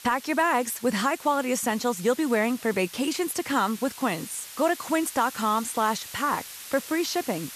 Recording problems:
hiss; noticeable; throughout; 15 dB below the speech

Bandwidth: 14 kHz